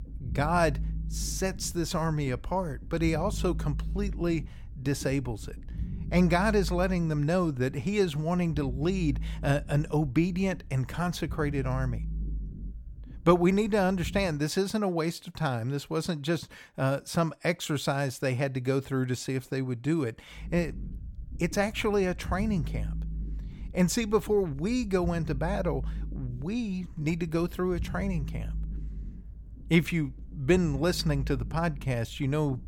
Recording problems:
low rumble; faint; until 14 s and from 20 s on; 20 dB below the speech

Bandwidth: 17.5 kHz